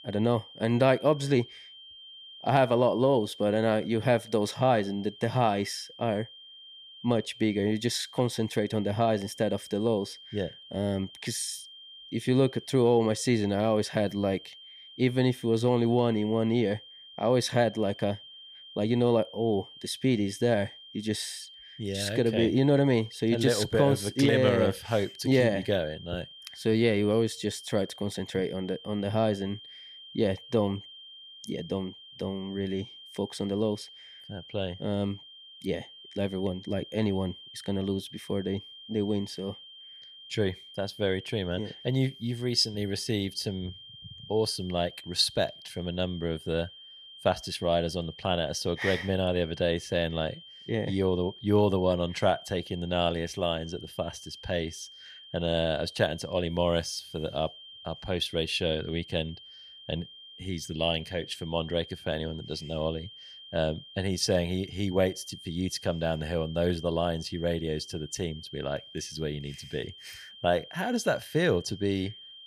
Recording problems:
high-pitched whine; noticeable; throughout; 3 kHz, 15 dB below the speech

